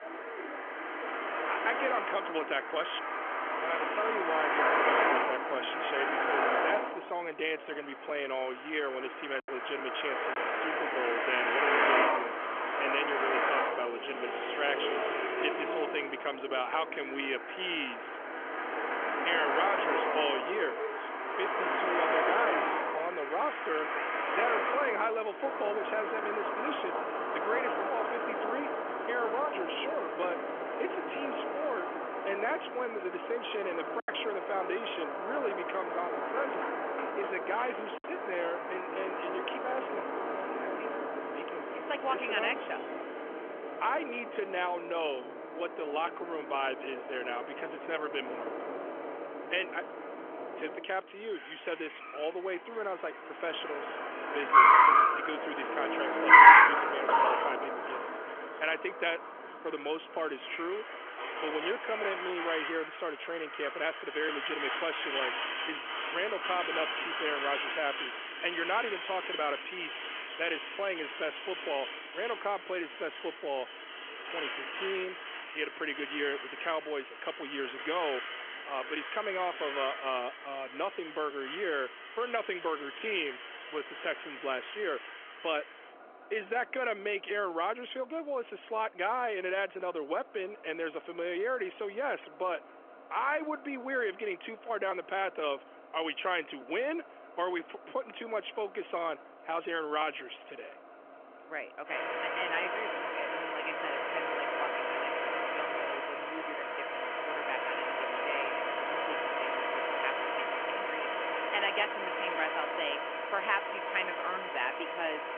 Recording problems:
phone-call audio; nothing above 3.5 kHz
traffic noise; very loud; throughout; 5 dB above the speech
choppy; occasionally; at 9.5 s, at 34 s and at 38 s; 4% of the speech affected

